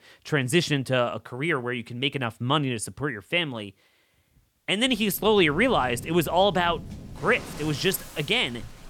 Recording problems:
rain or running water; noticeable; from 5.5 s on; 15 dB below the speech

